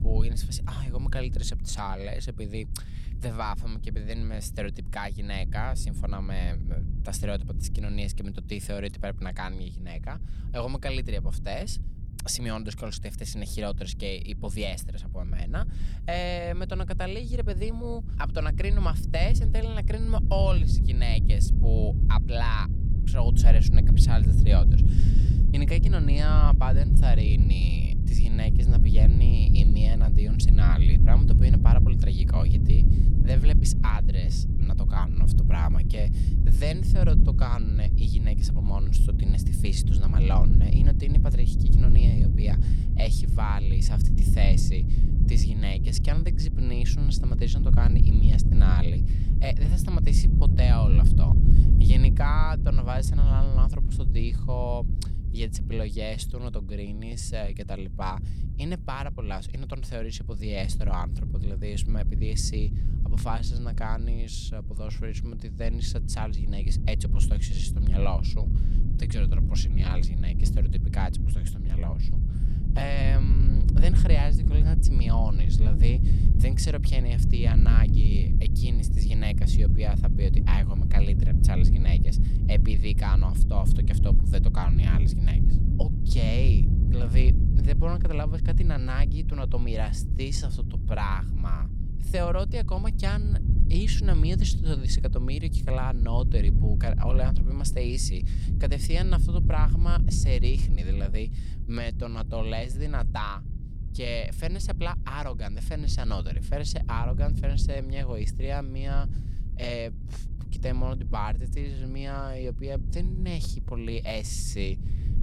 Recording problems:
low rumble; loud; throughout; 4 dB below the speech

